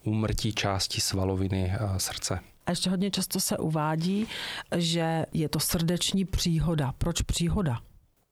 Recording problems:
squashed, flat; heavily

